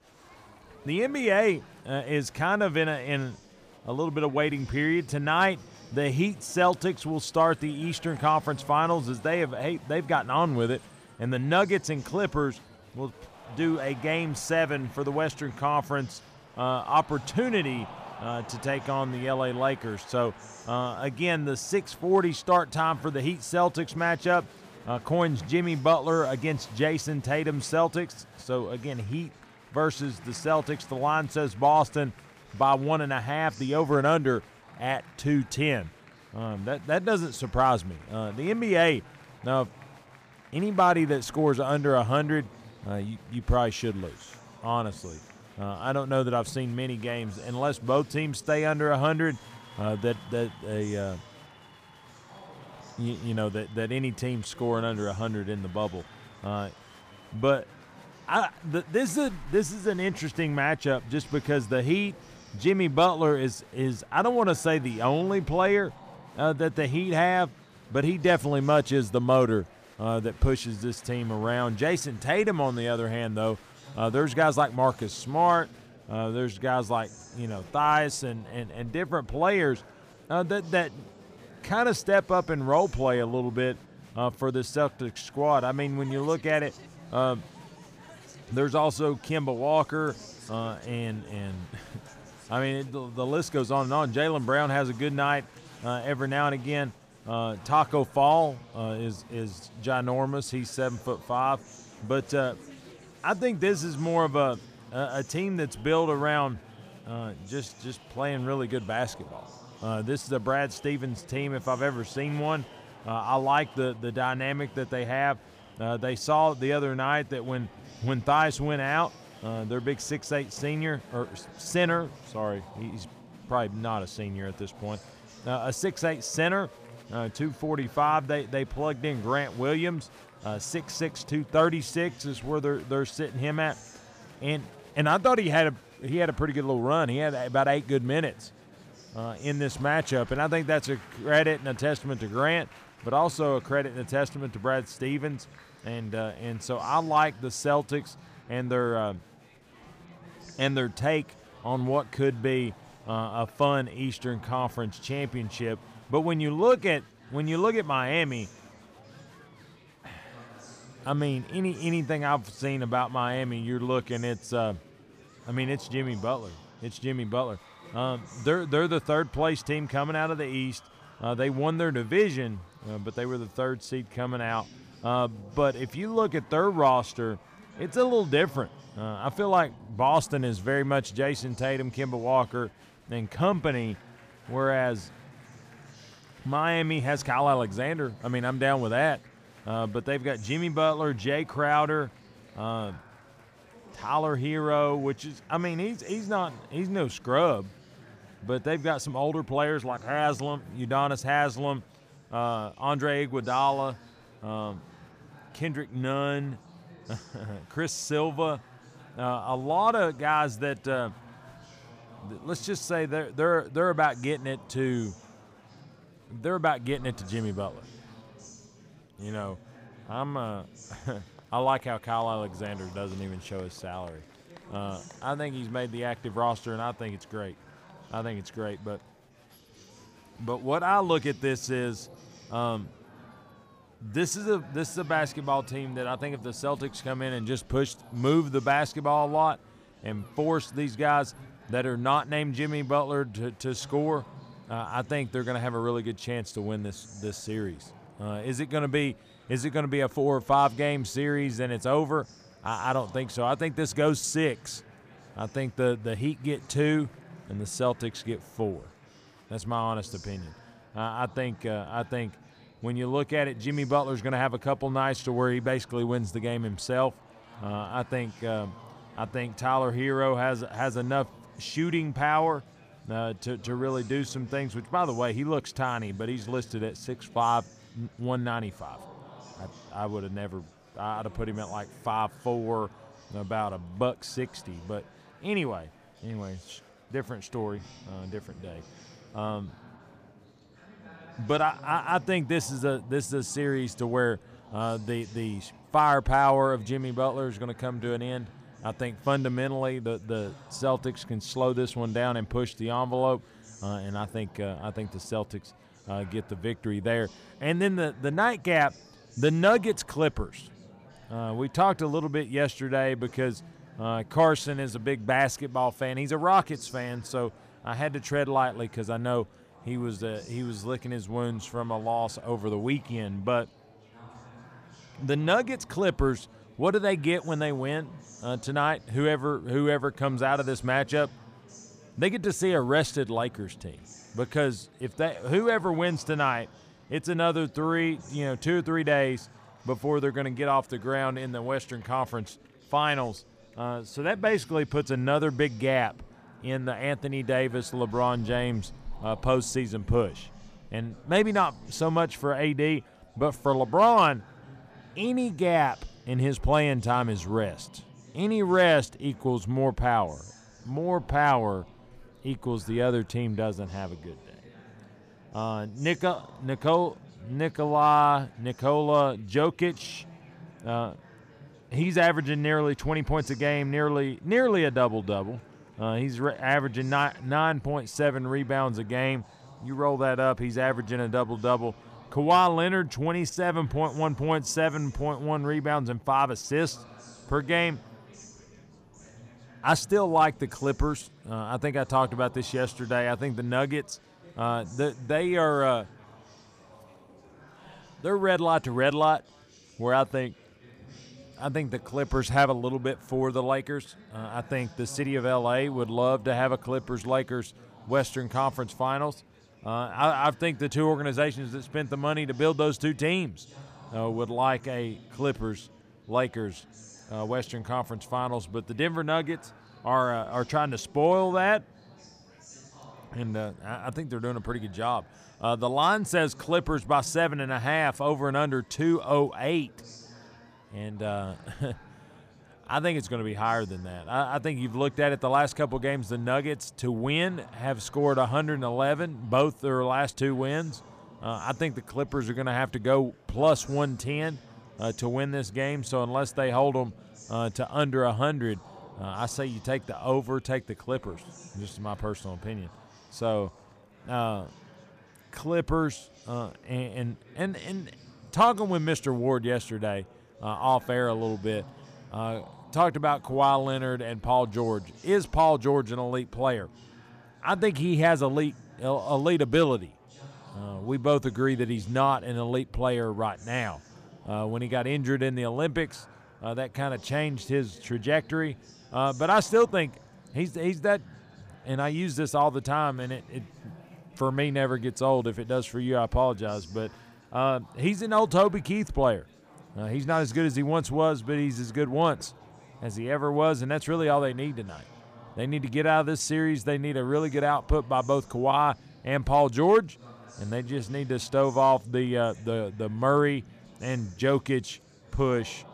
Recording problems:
murmuring crowd; faint; throughout; 25 dB below the speech

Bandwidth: 15 kHz